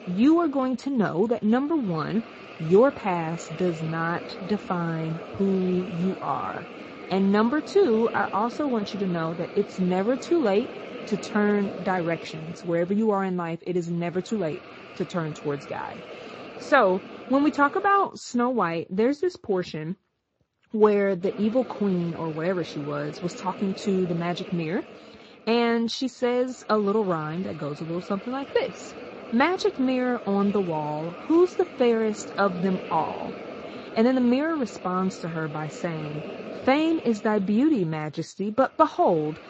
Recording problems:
garbled, watery; slightly; nothing above 7.5 kHz
hiss; noticeable; until 18 s and from 21 s on; 15 dB below the speech

